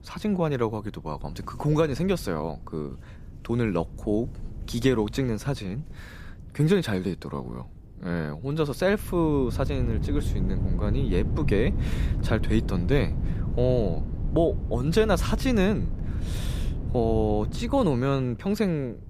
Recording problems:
wind noise on the microphone; occasional gusts; 15 dB below the speech

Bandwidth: 14.5 kHz